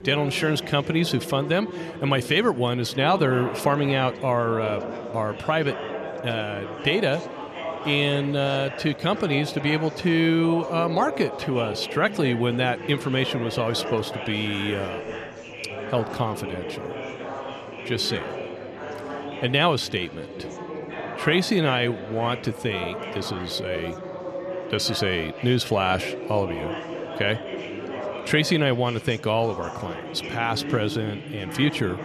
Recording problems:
echo of what is said; faint; throughout; 250 ms later, 20 dB below the speech
chatter from many people; loud; throughout; 9 dB below the speech

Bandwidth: 13.5 kHz